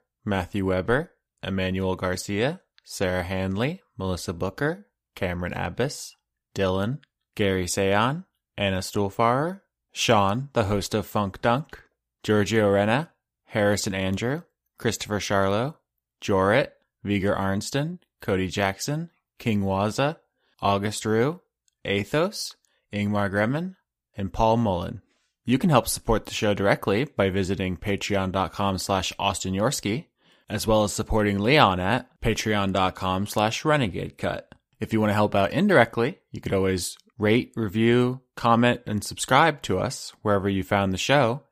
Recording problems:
none

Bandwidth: 15 kHz